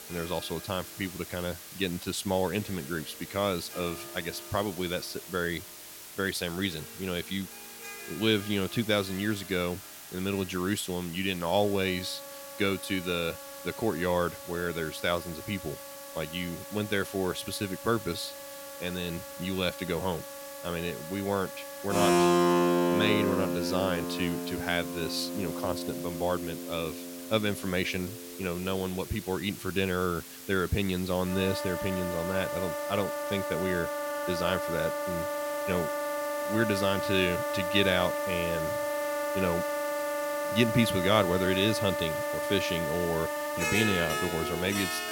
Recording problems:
background music; loud; throughout; 1 dB below the speech
hiss; noticeable; throughout; 10 dB below the speech

